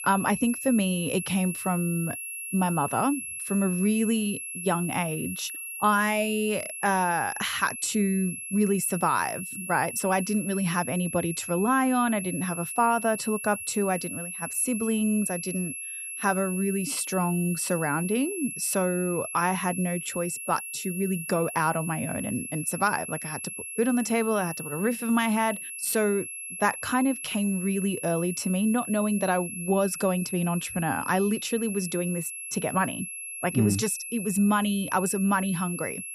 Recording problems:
high-pitched whine; loud; throughout; 11 kHz, 7 dB below the speech

